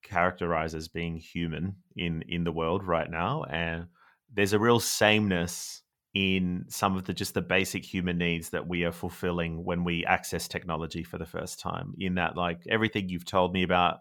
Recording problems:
none

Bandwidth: 18.5 kHz